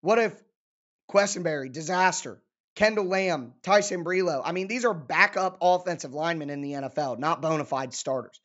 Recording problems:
high frequencies cut off; noticeable; nothing above 8 kHz

